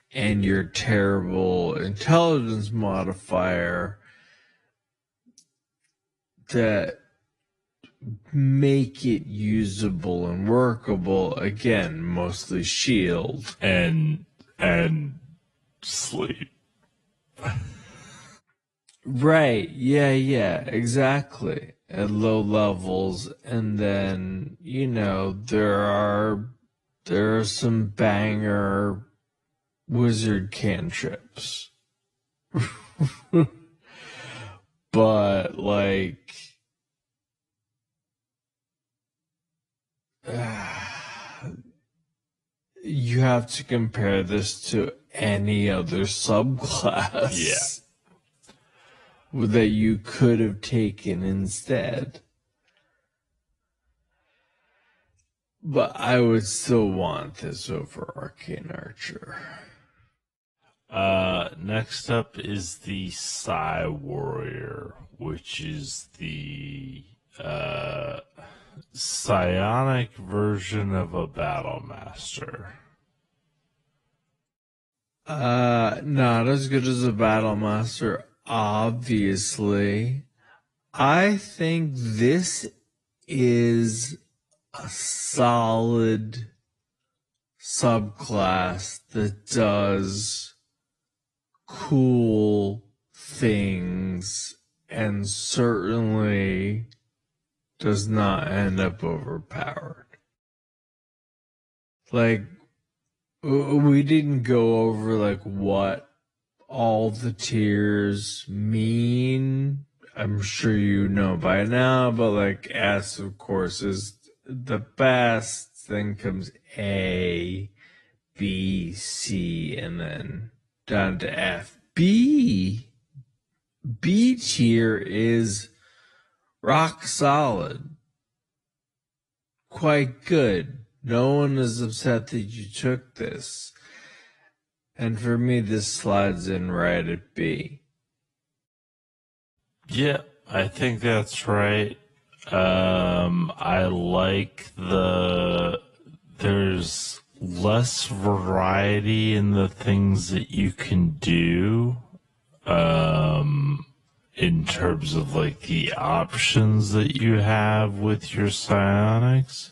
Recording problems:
wrong speed, natural pitch; too slow; 0.5 times normal speed
garbled, watery; slightly

